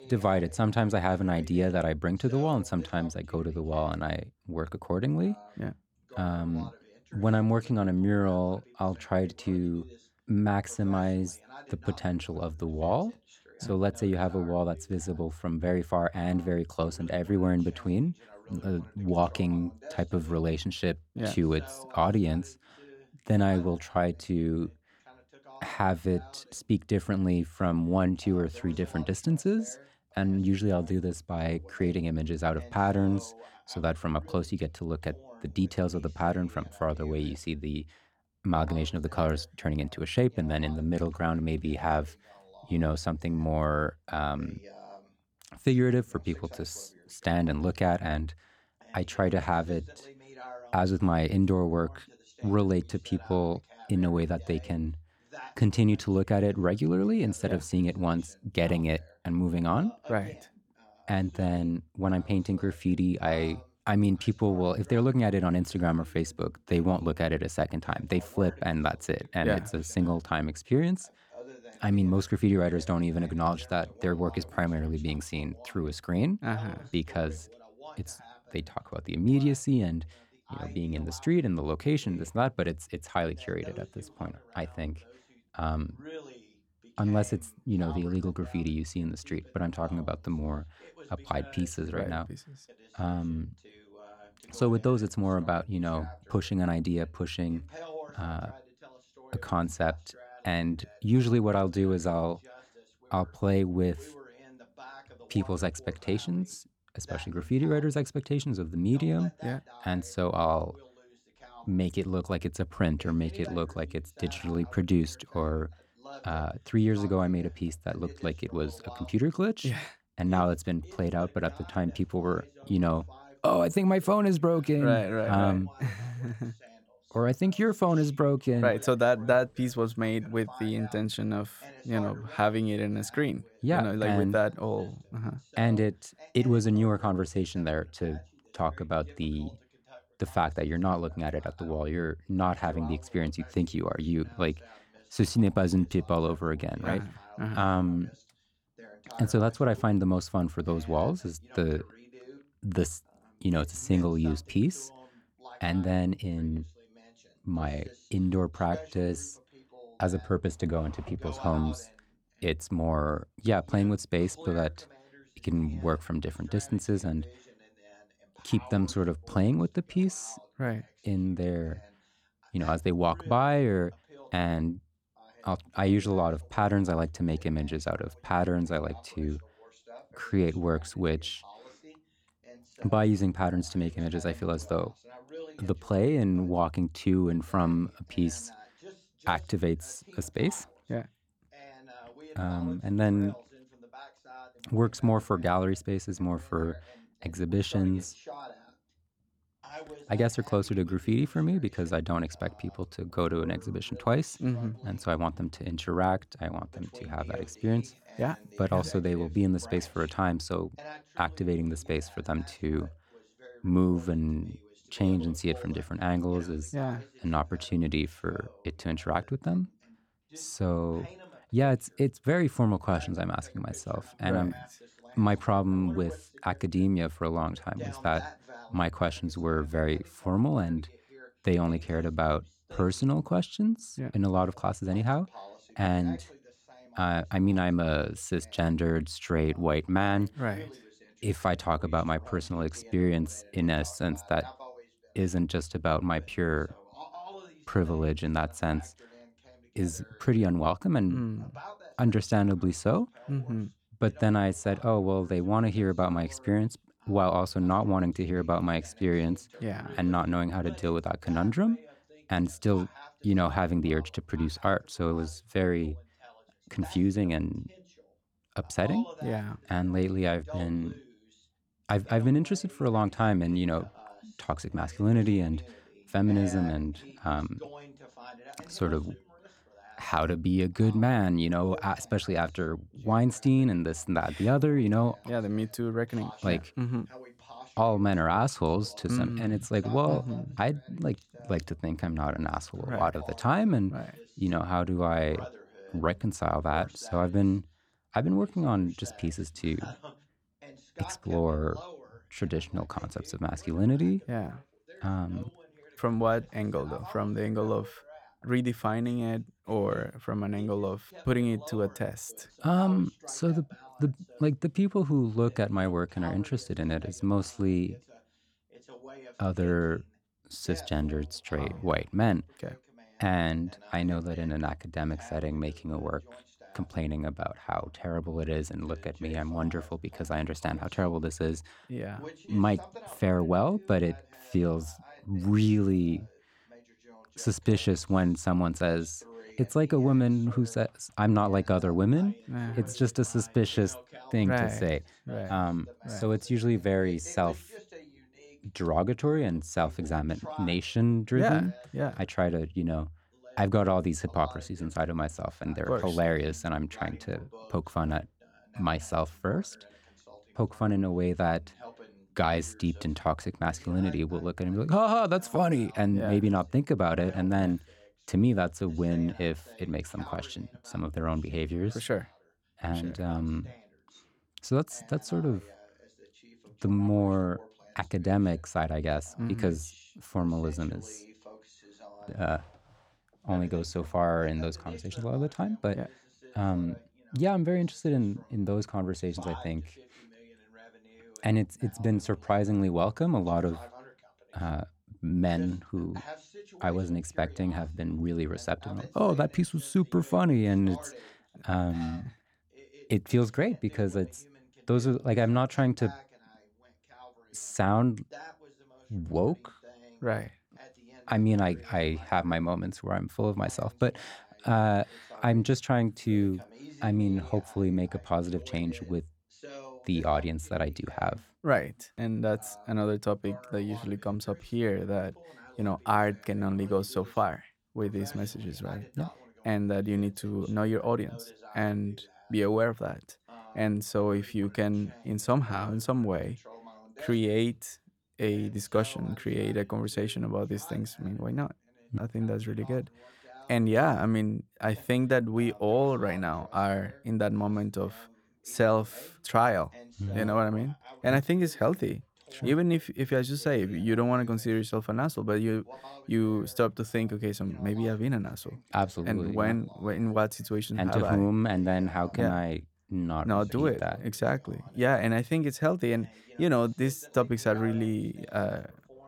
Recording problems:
voice in the background; faint; throughout; 20 dB below the speech

